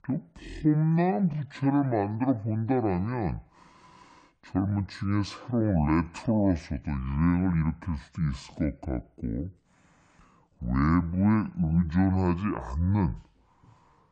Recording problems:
wrong speed and pitch; too slow and too low; 0.6 times normal speed

